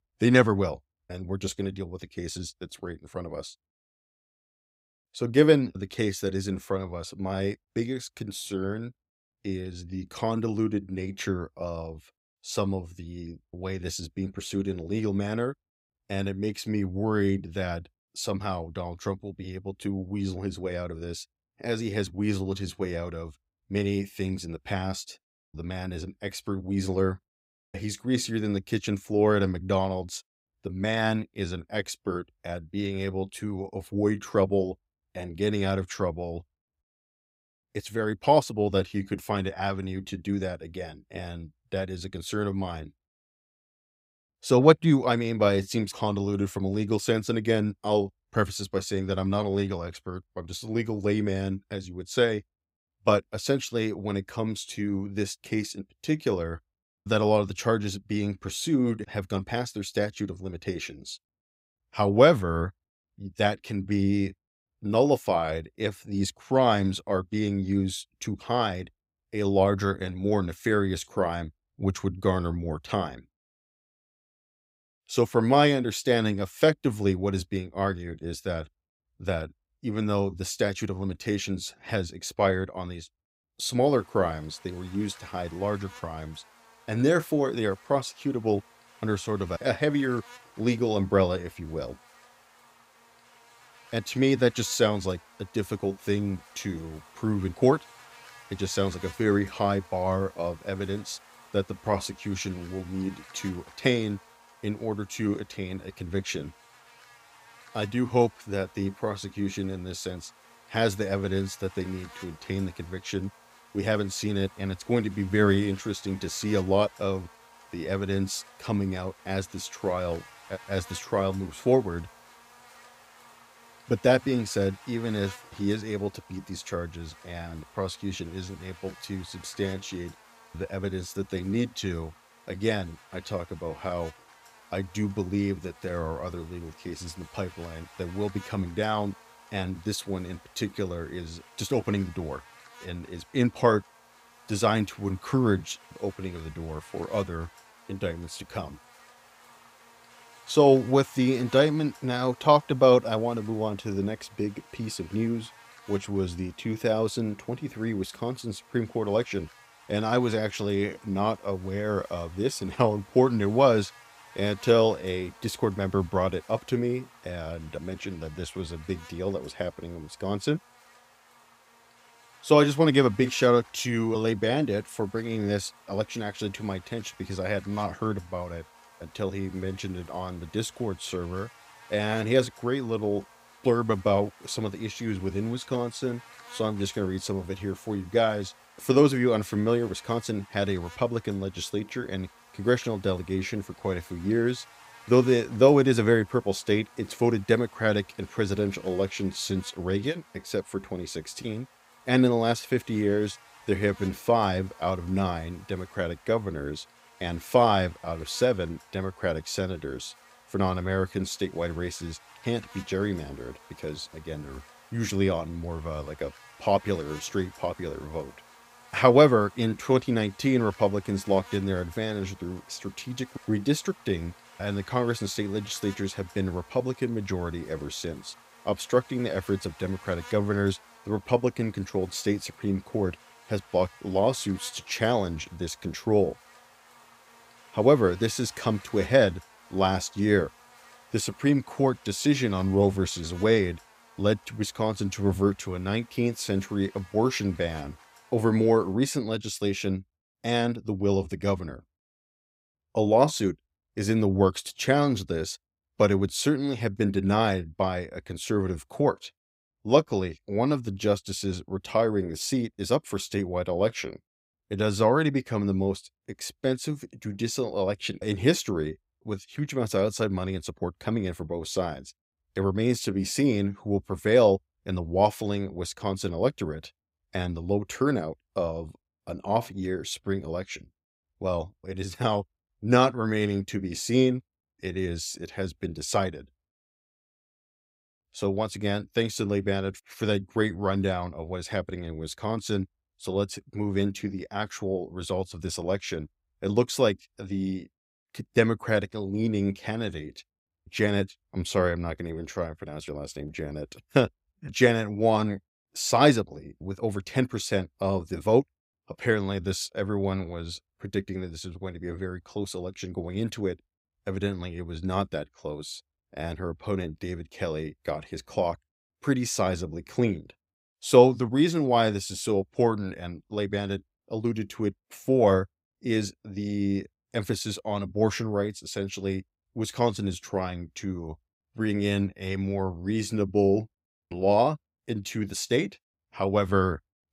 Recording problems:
electrical hum; faint; from 1:24 to 4:09; 50 Hz, 20 dB below the speech

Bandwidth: 15.5 kHz